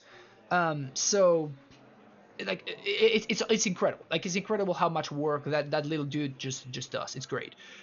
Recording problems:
high frequencies cut off; noticeable; nothing above 6.5 kHz
chatter from many people; faint; throughout; 30 dB below the speech

